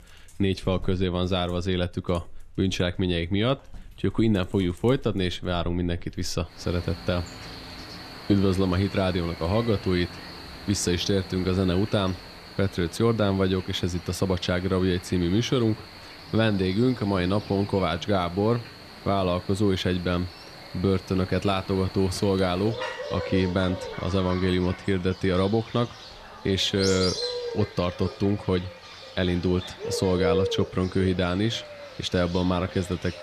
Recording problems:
animal sounds; noticeable; throughout; 10 dB below the speech

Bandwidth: 13.5 kHz